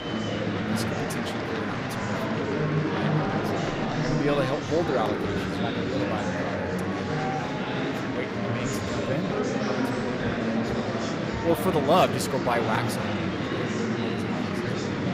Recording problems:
murmuring crowd; very loud; throughout; 3 dB above the speech

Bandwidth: 15.5 kHz